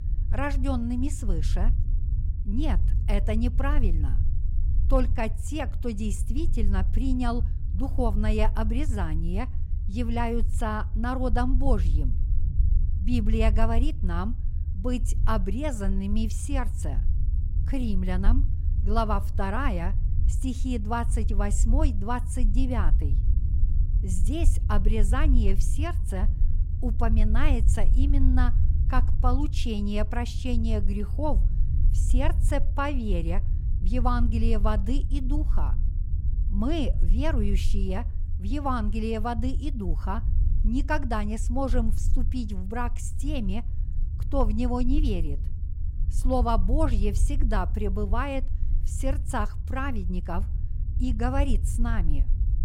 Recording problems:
low rumble; noticeable; throughout; 15 dB below the speech

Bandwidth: 16 kHz